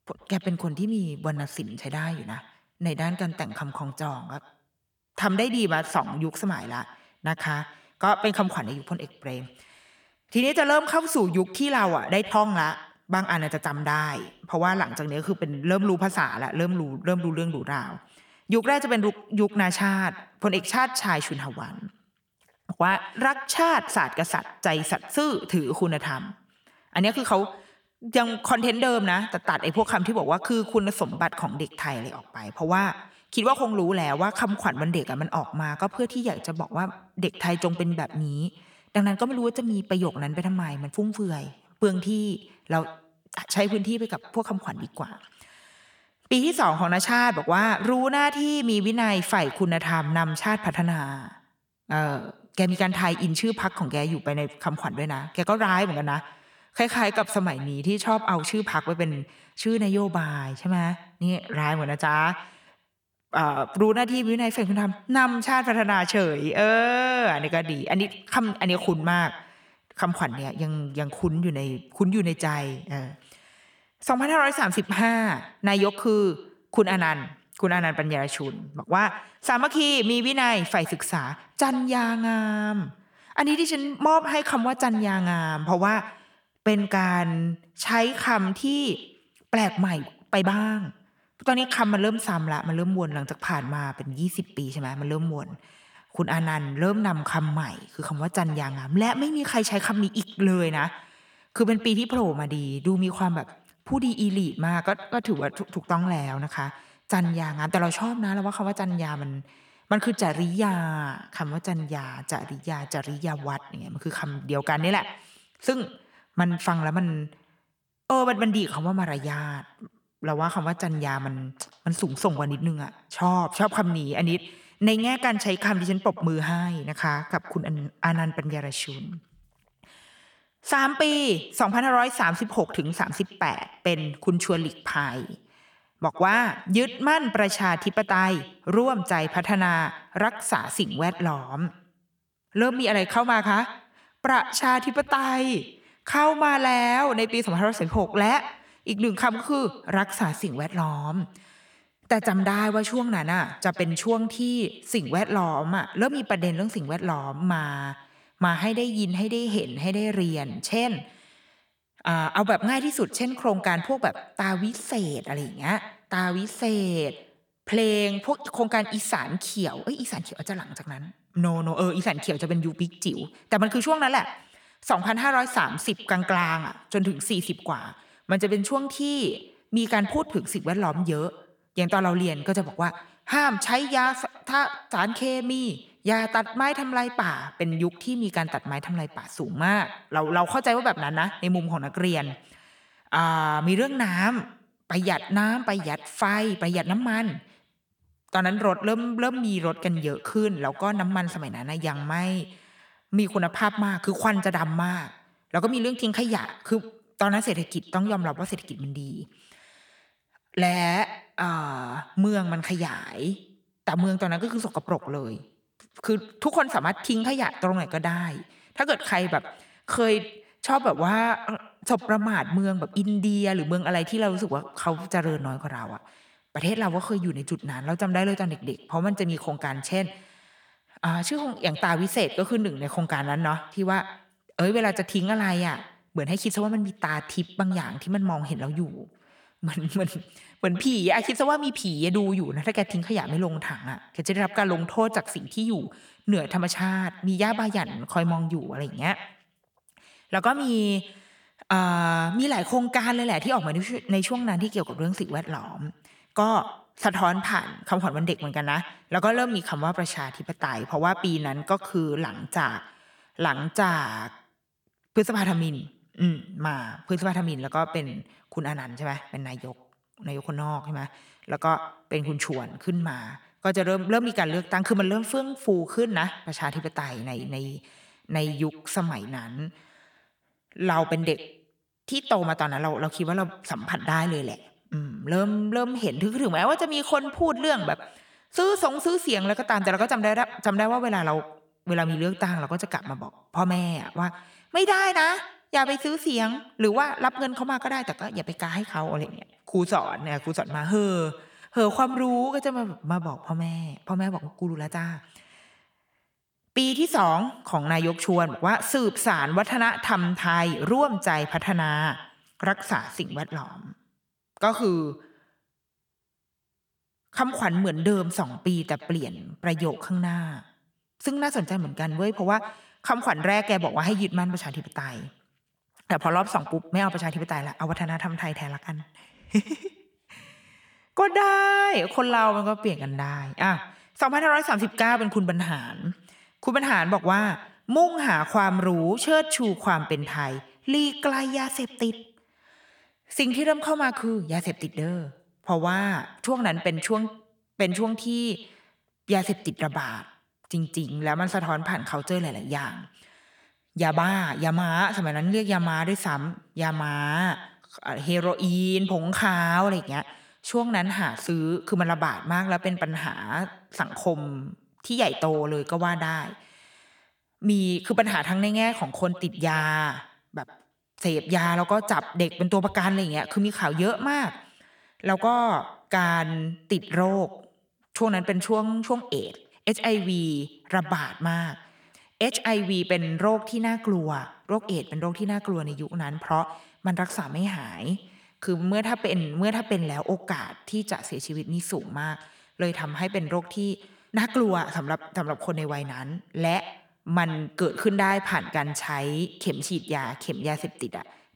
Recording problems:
echo of what is said; noticeable; throughout; 110 ms later, 15 dB below the speech

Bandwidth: 18.5 kHz